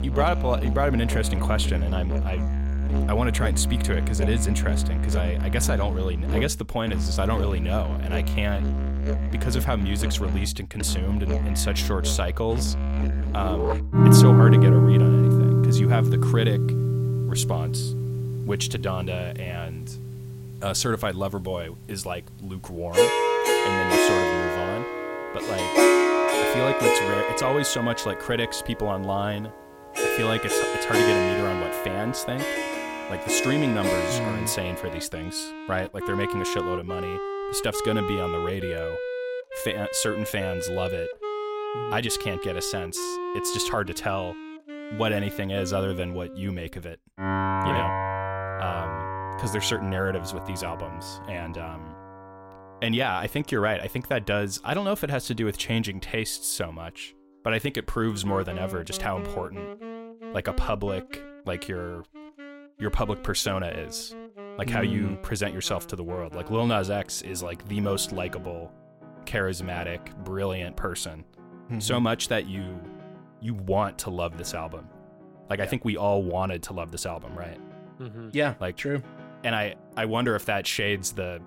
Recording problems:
background music; very loud; throughout; 4 dB above the speech

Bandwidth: 16 kHz